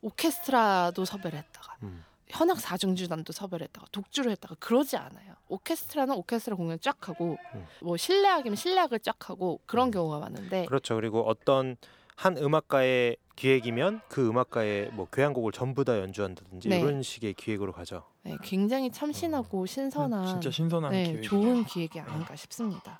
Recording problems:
animal sounds; faint; throughout; 20 dB below the speech

